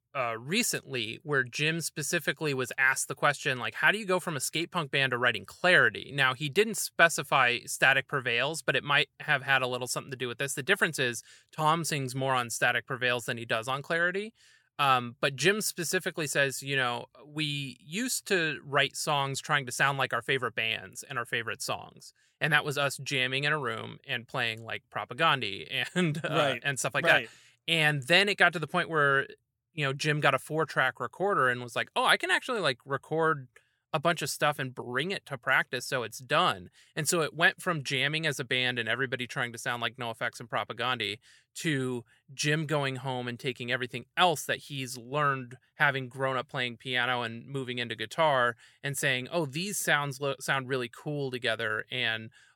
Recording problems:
none

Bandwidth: 17 kHz